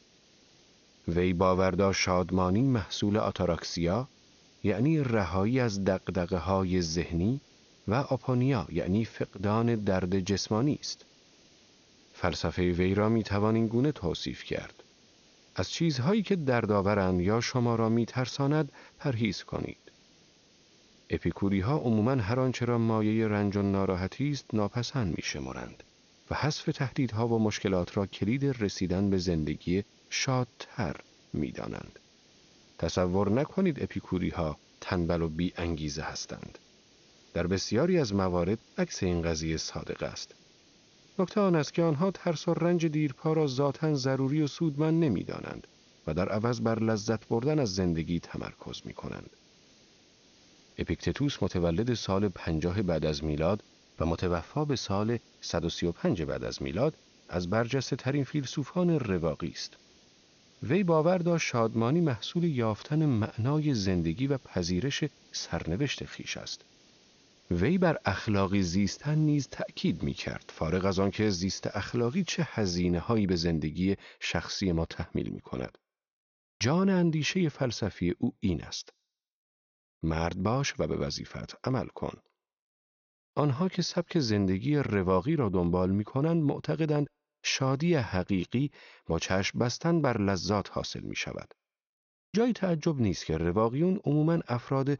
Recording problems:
high frequencies cut off; noticeable; nothing above 6.5 kHz
hiss; faint; until 1:12; 30 dB below the speech

